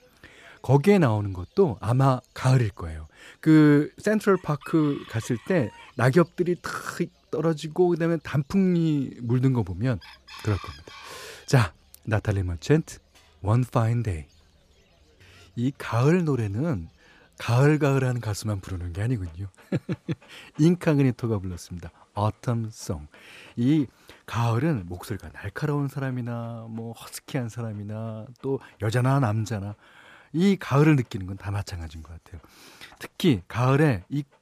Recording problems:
animal sounds; faint; throughout; 30 dB below the speech

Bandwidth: 14.5 kHz